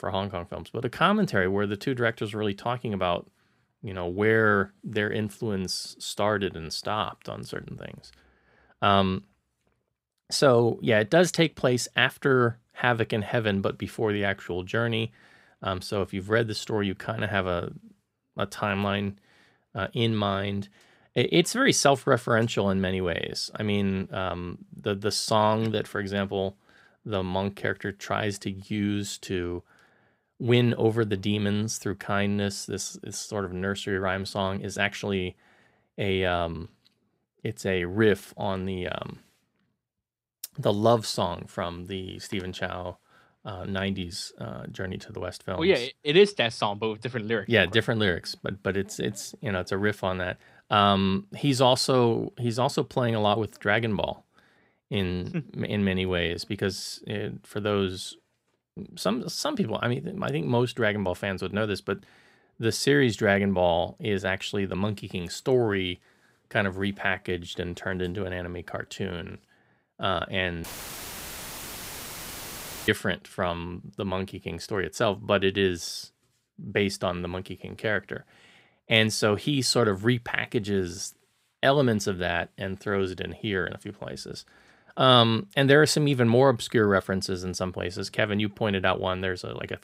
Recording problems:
audio cutting out; filled with static; at 1:11 for 2 s

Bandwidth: 15.5 kHz